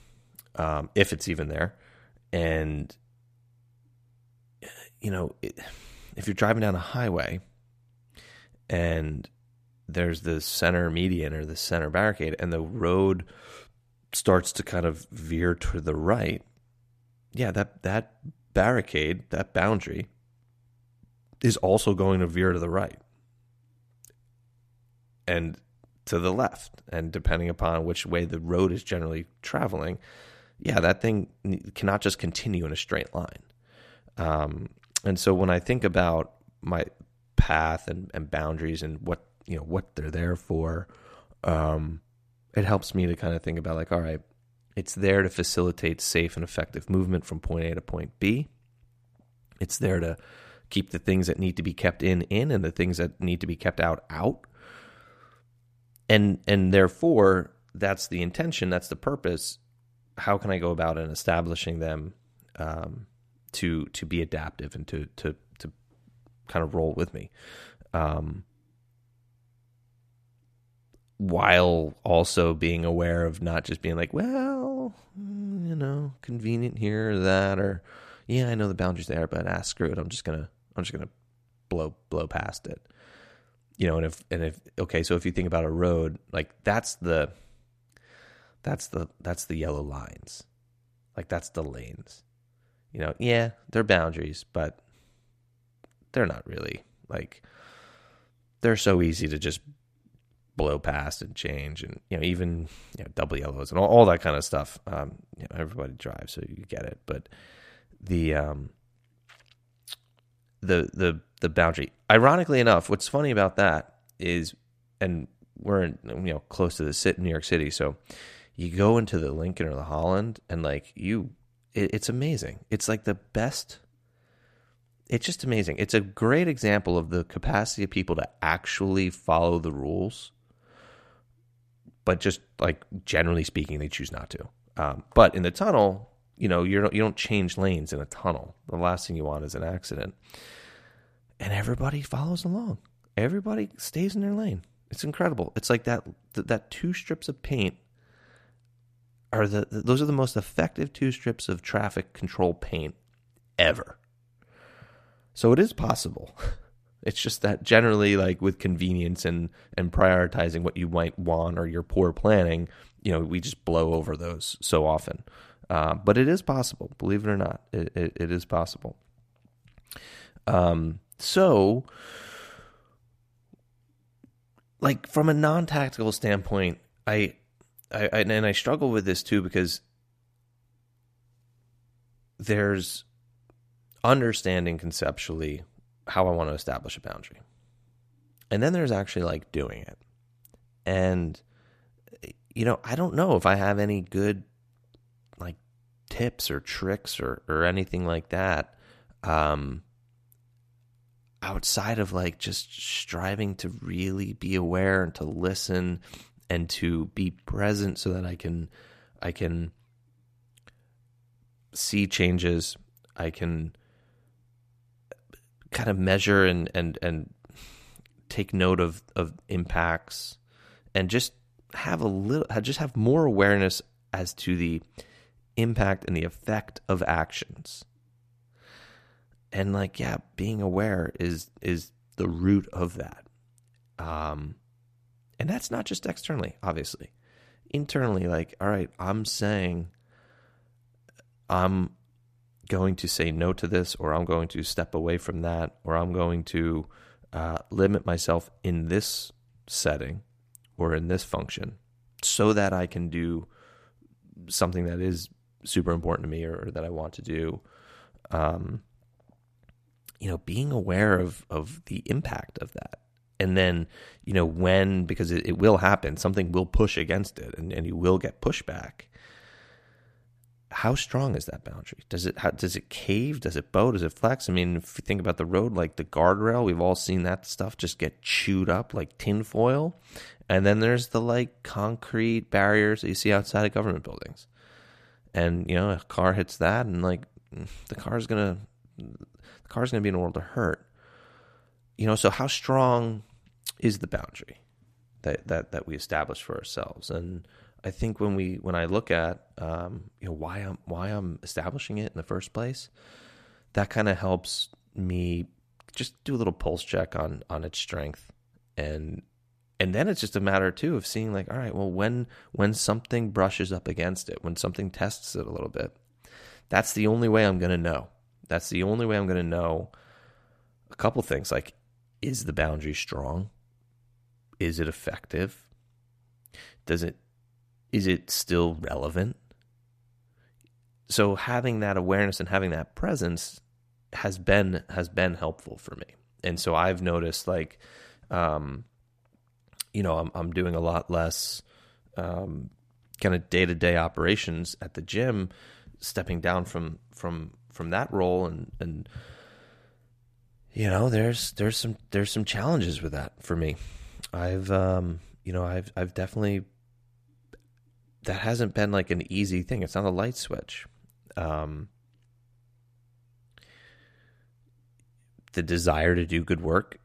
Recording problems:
none

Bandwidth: 14.5 kHz